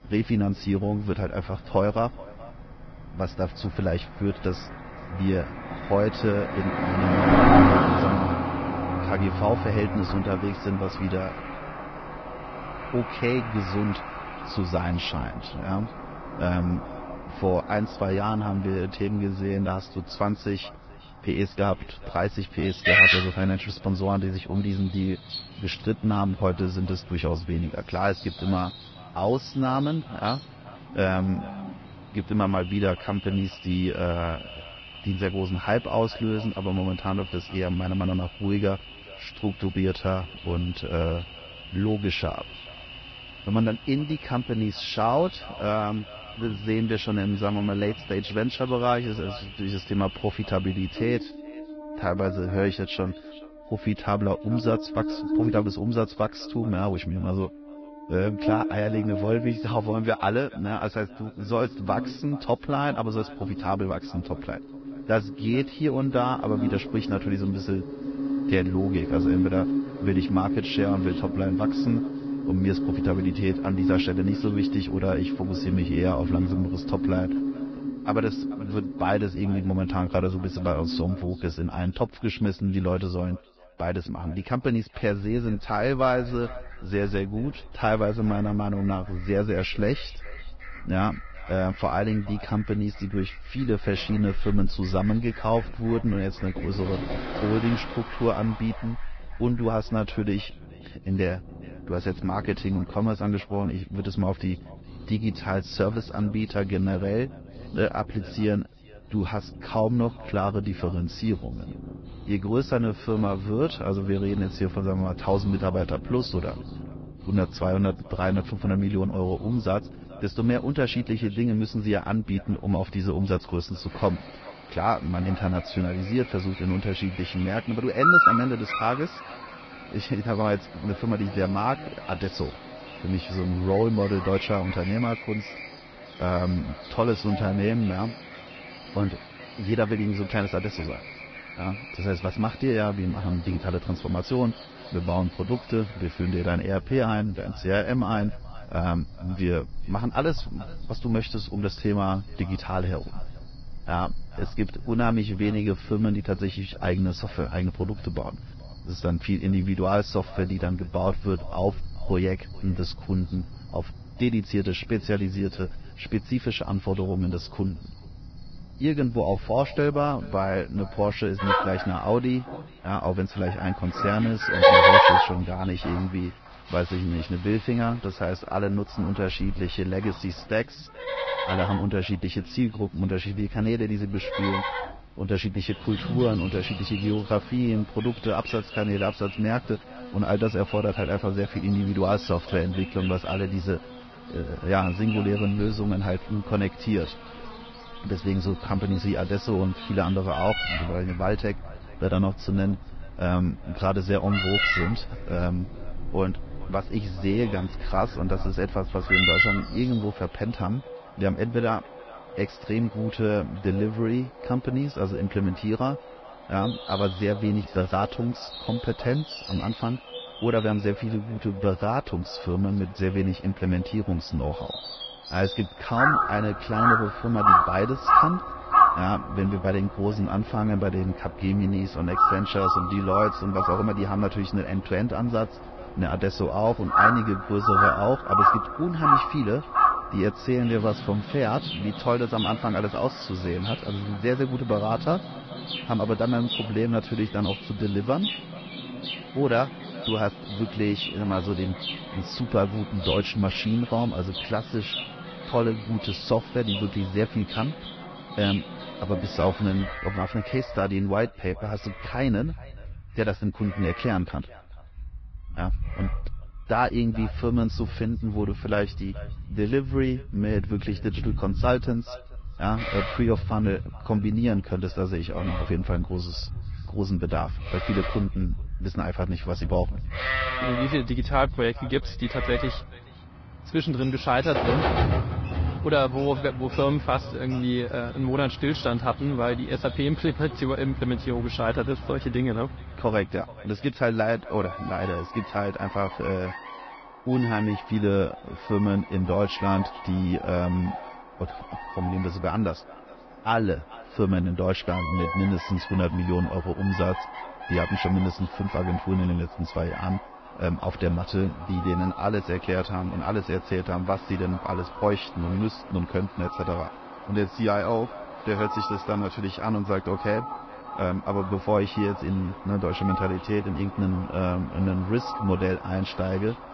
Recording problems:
garbled, watery; badly
high frequencies cut off; noticeable; nothing above 5.5 kHz
echo of what is said; faint; throughout; 430 ms later, 25 dB below the speech
animal sounds; loud; throughout; 2 dB below the speech

